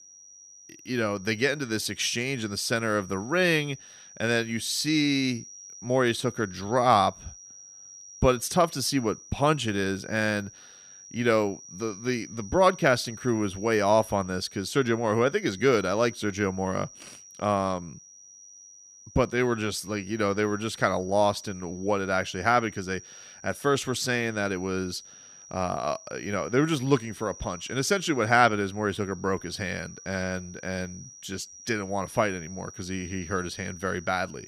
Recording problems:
high-pitched whine; noticeable; throughout; 6 kHz, 20 dB below the speech

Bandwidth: 14.5 kHz